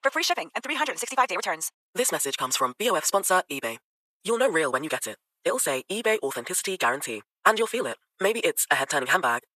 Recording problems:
thin; very; fading below 750 Hz
wrong speed, natural pitch; too fast; 1.7 times normal speed

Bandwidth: 14 kHz